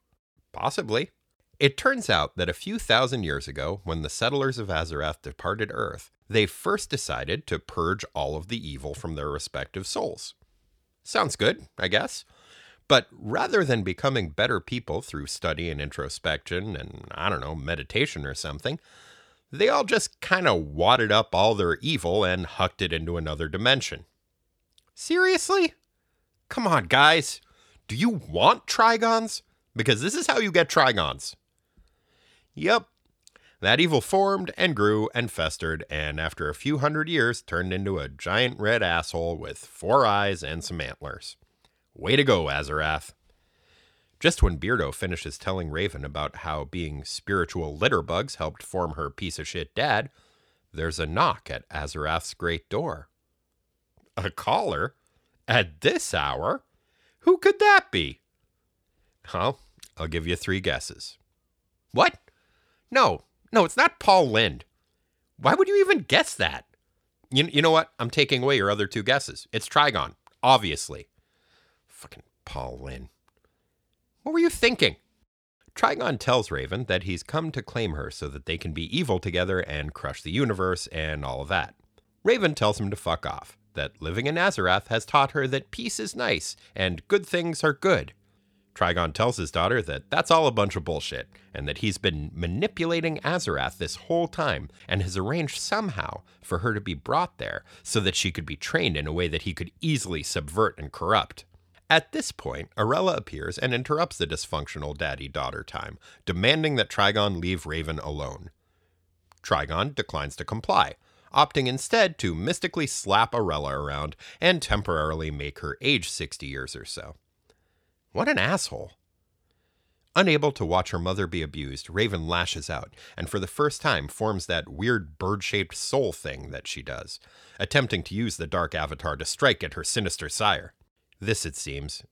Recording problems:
none

